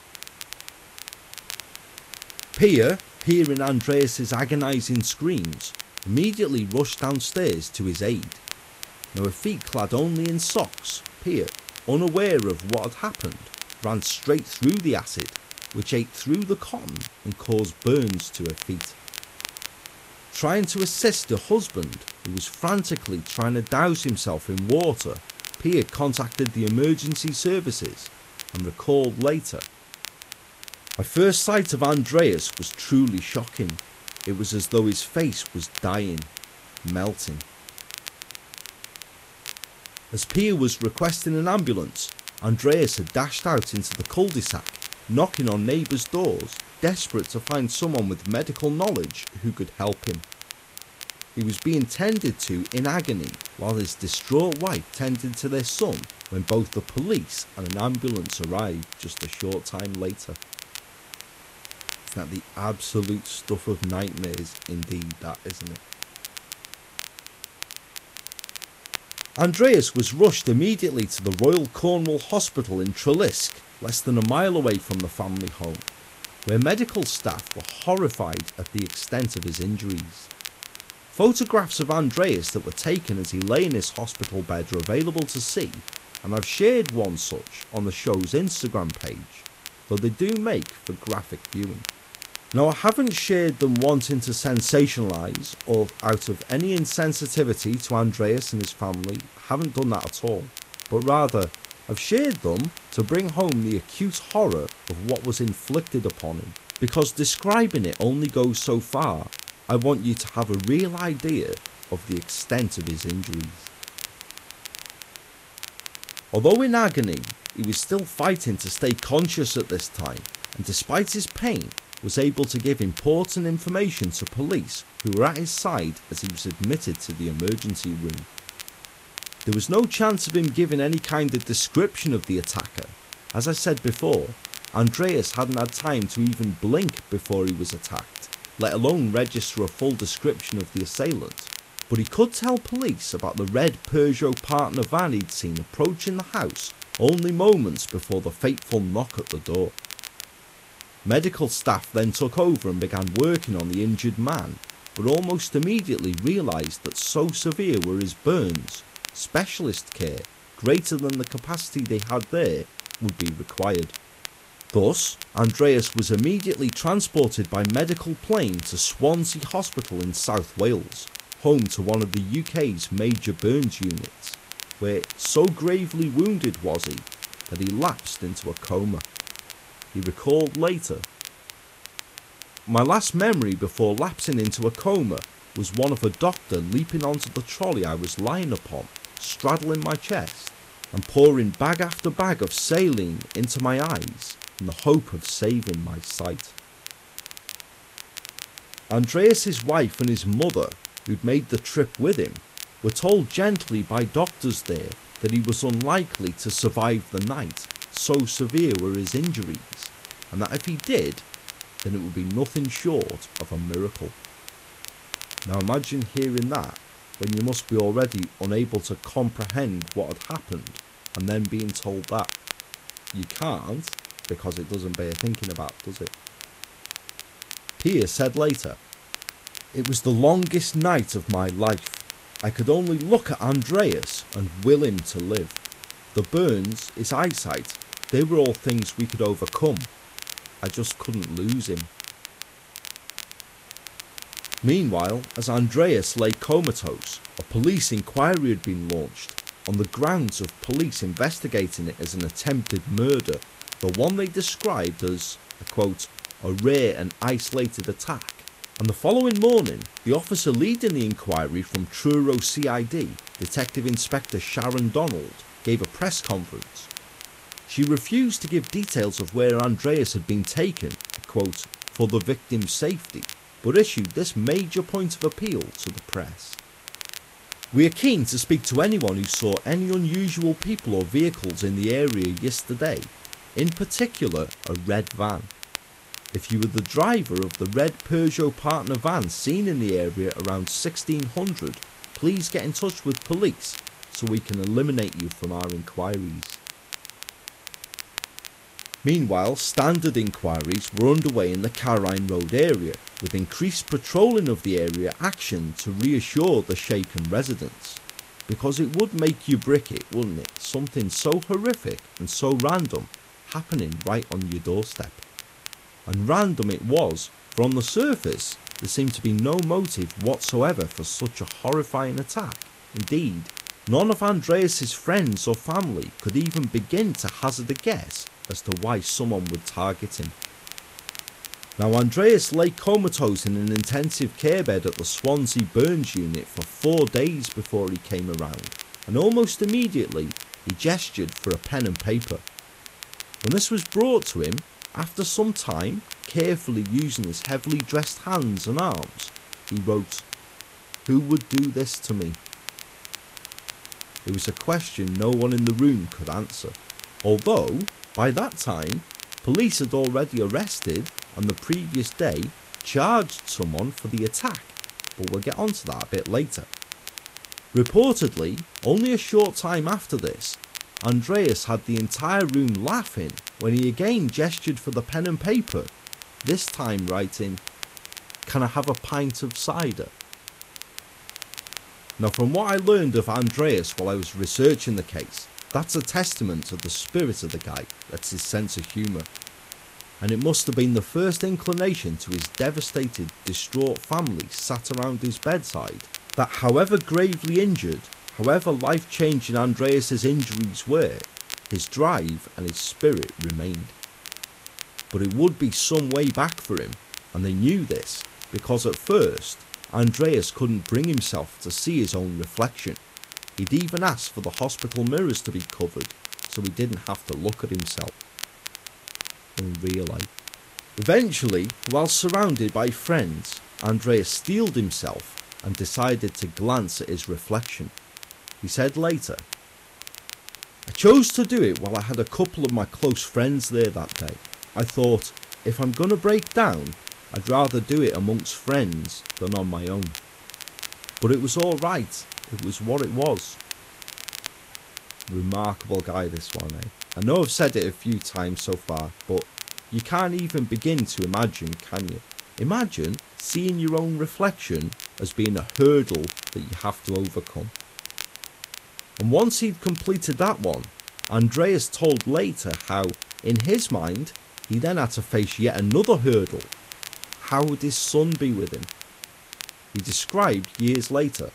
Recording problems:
garbled, watery; slightly; nothing above 13 kHz
crackle, like an old record; noticeable; 15 dB below the speech
hiss; faint; throughout; 20 dB below the speech

